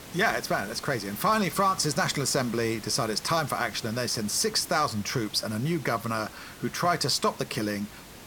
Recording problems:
hiss; noticeable; throughout; 15 dB below the speech

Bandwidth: 17 kHz